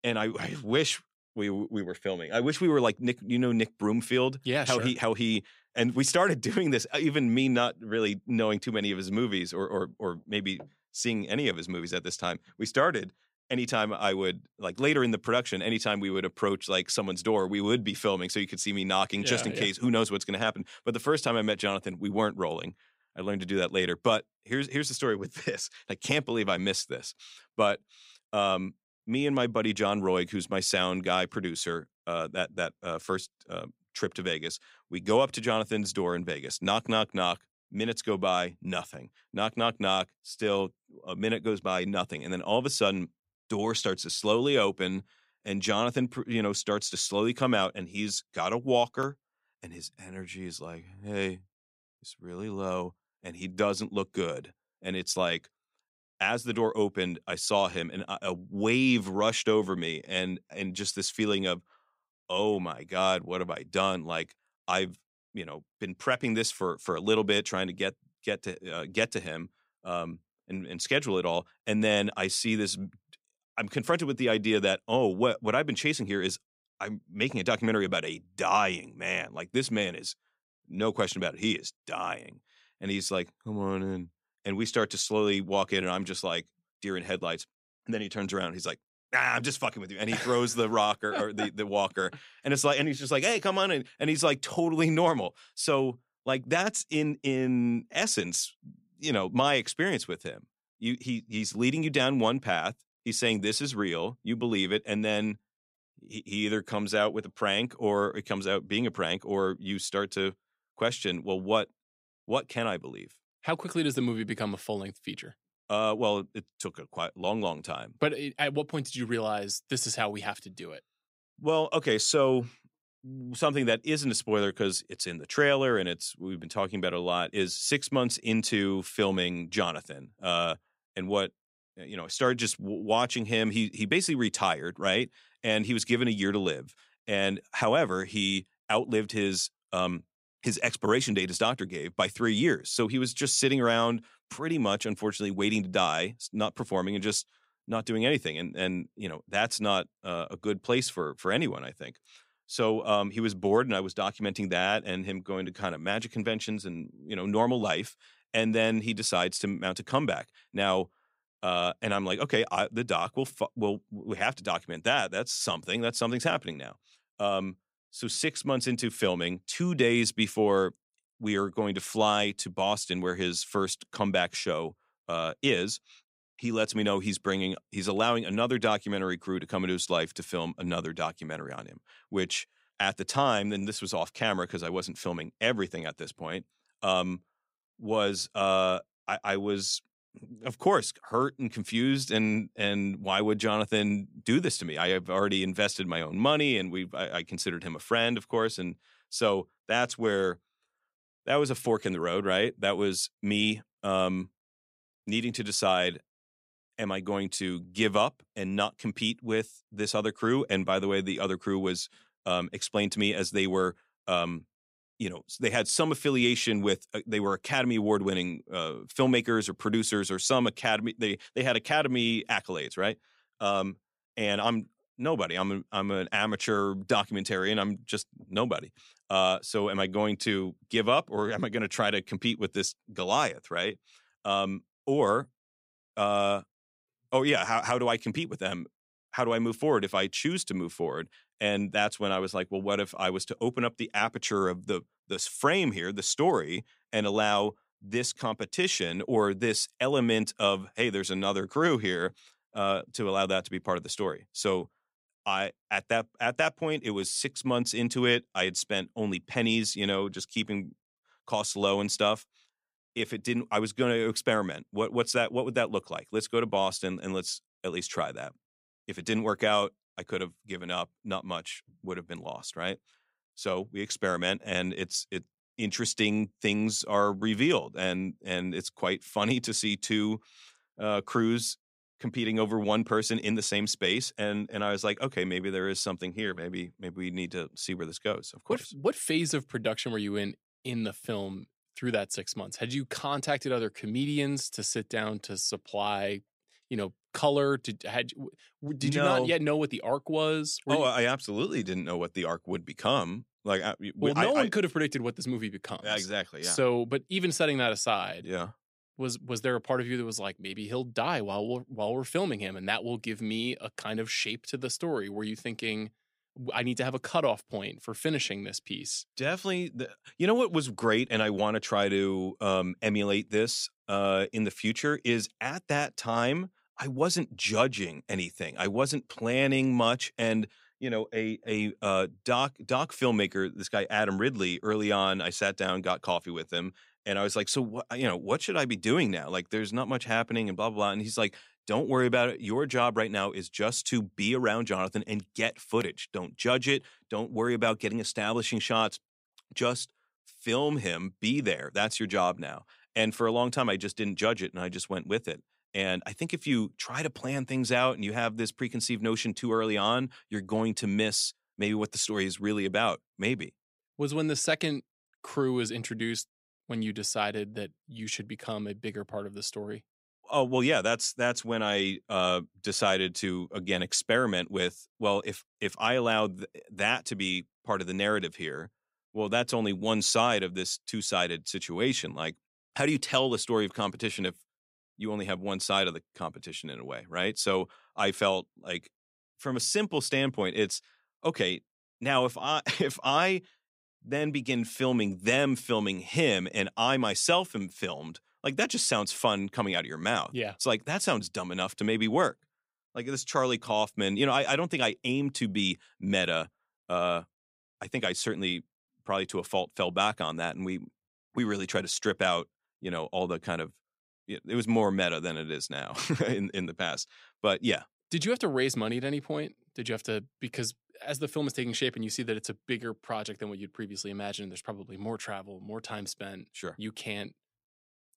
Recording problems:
none

